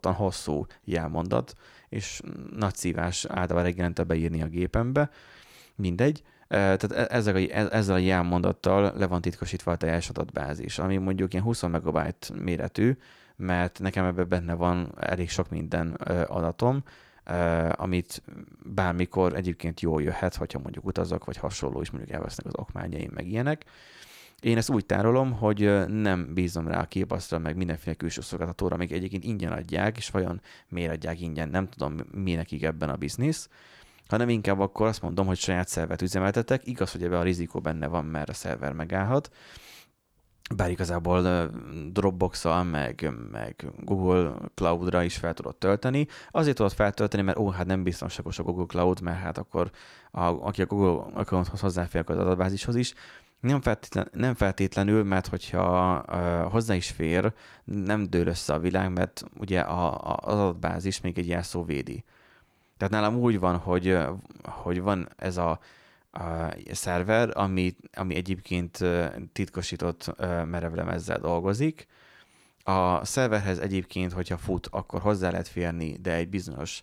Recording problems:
none

